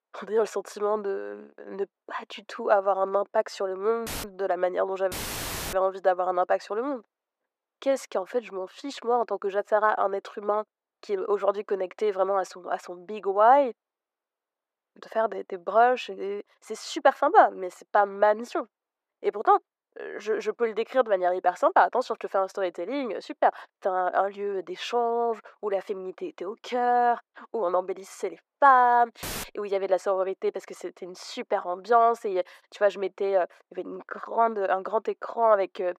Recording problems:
thin; very; fading below 500 Hz
muffled; slightly; fading above 2 kHz
audio cutting out; filled with static; at 4 s, at 5 s for 0.5 s and at 29 s

